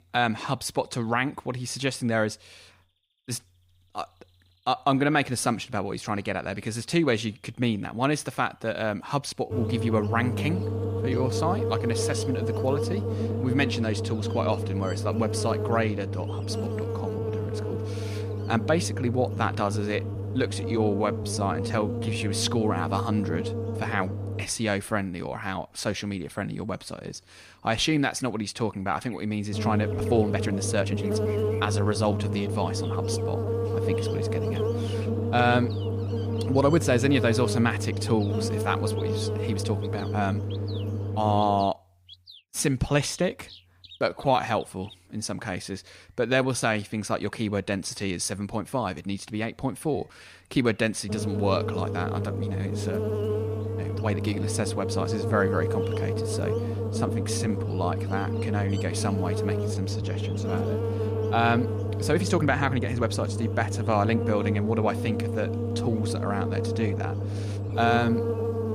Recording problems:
electrical hum; loud; from 9.5 to 24 s, from 30 to 42 s and from 51 s on; 50 Hz, 5 dB below the speech
animal sounds; faint; throughout; 25 dB below the speech
uneven, jittery; strongly; from 8.5 s to 1:08

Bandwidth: 15.5 kHz